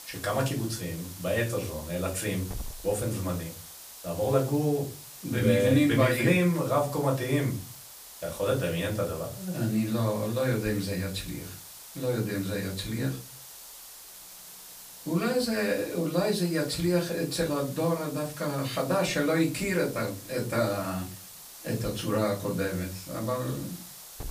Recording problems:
off-mic speech; far
room echo; very slight; dies away in 0.3 s
hiss; noticeable; throughout; 15 dB below the speech

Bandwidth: 15 kHz